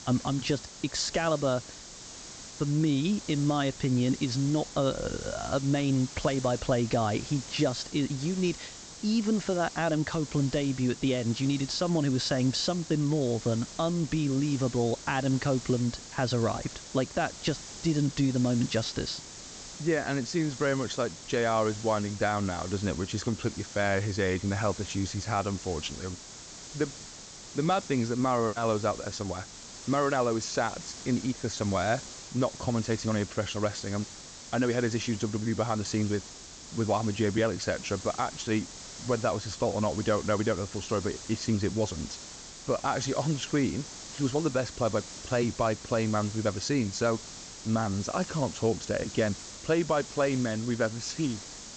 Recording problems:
high frequencies cut off; noticeable; nothing above 8 kHz
hiss; noticeable; throughout; 10 dB below the speech

